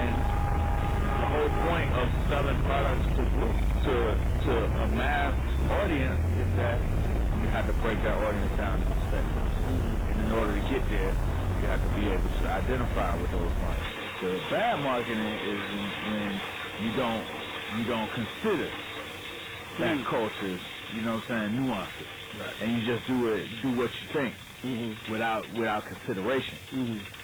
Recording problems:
distortion; heavy; 6 dB below the speech
garbled, watery; badly; nothing above 4 kHz
traffic noise; loud; throughout; 1 dB below the speech
hiss; noticeable; throughout; 20 dB below the speech
crackling; noticeable; from 14 to 17 s, at 20 s and from 22 to 24 s; 15 dB below the speech
abrupt cut into speech; at the start

